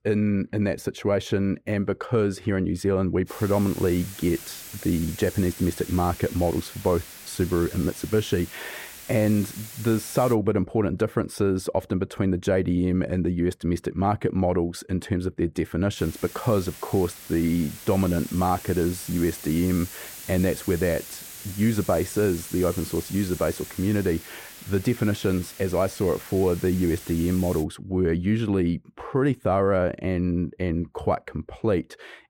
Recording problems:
muffled; slightly; fading above 2.5 kHz
hiss; noticeable; from 3.5 to 10 s and from 16 to 28 s; 15 dB below the speech

